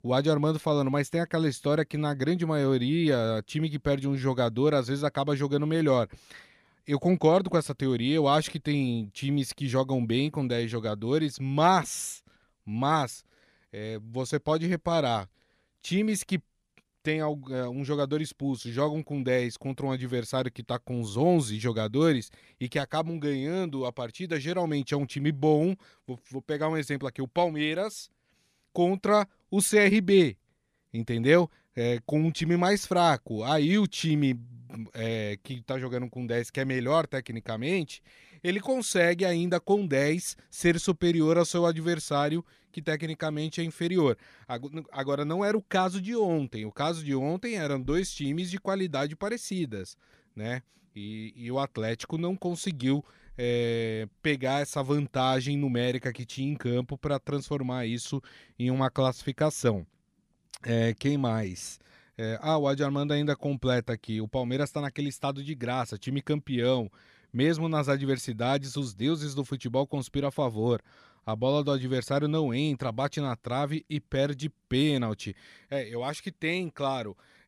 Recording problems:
none

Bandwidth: 14.5 kHz